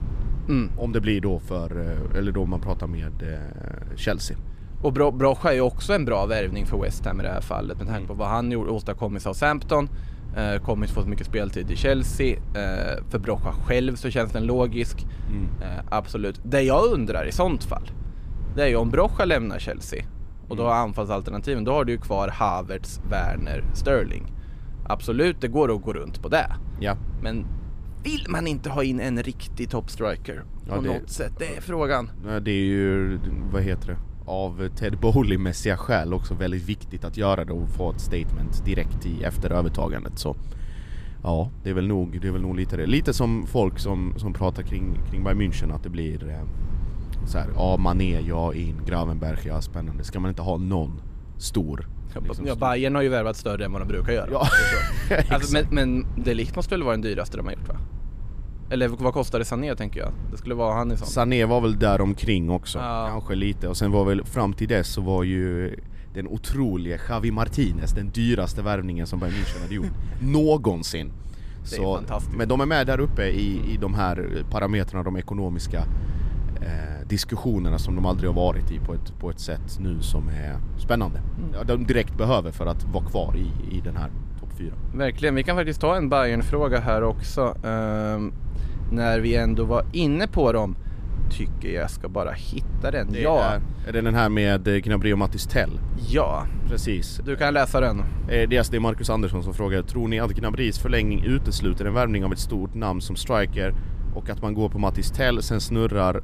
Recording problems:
low rumble; faint; throughout; 20 dB below the speech

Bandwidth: 14.5 kHz